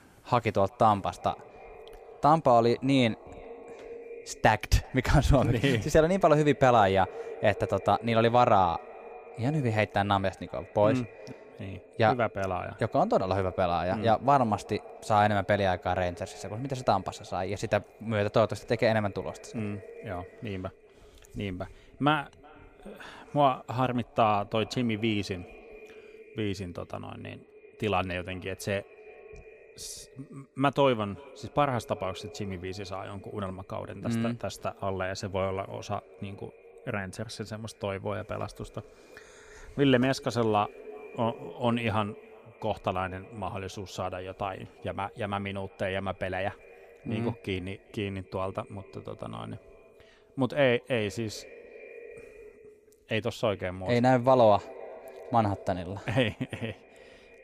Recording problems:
echo of what is said; faint; throughout; 370 ms later, 20 dB below the speech

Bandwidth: 15 kHz